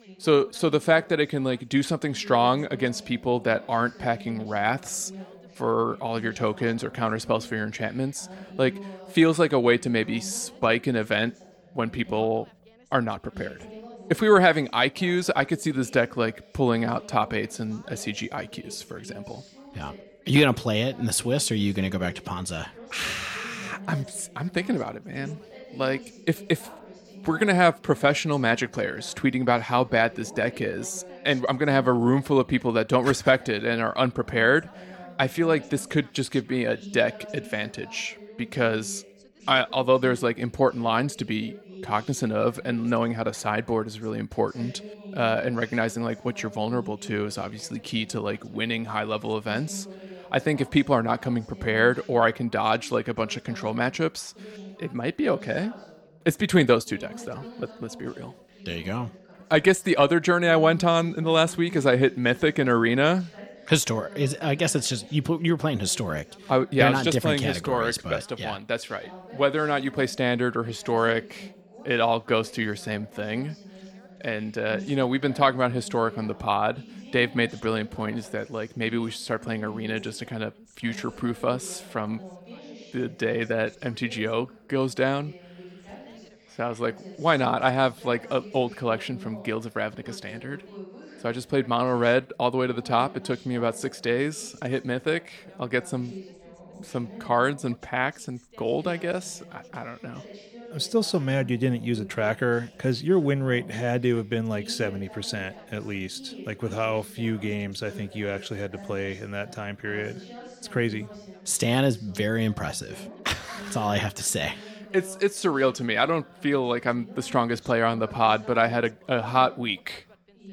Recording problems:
background chatter; noticeable; throughout; 2 voices, 20 dB below the speech

